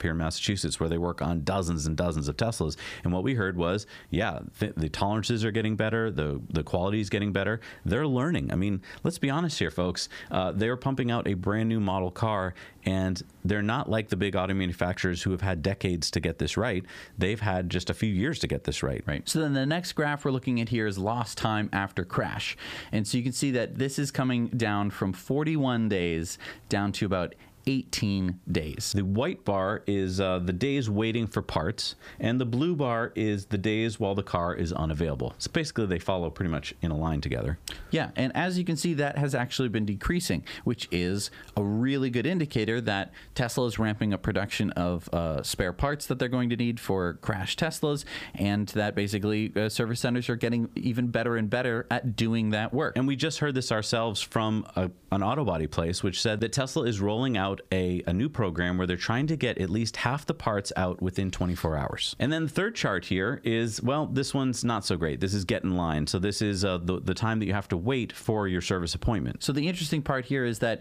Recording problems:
squashed, flat; somewhat

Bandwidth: 15 kHz